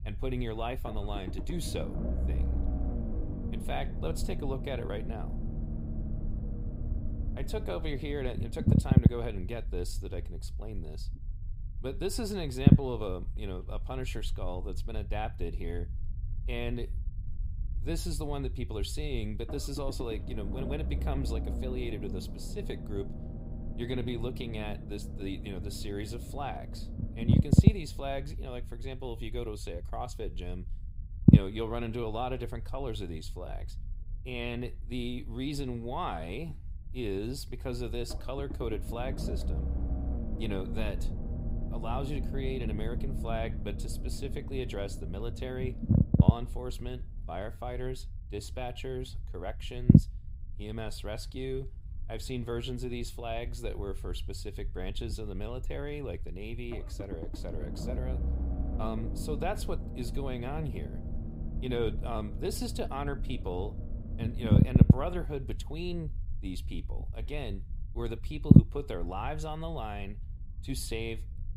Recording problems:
low rumble; loud; throughout; as loud as the speech

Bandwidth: 15.5 kHz